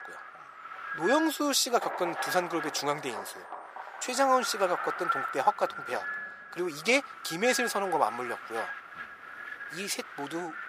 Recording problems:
thin; very; fading below 650 Hz
wind noise on the microphone; heavy; 7 dB below the speech
rain or running water; noticeable; throughout; 15 dB below the speech

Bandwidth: 15 kHz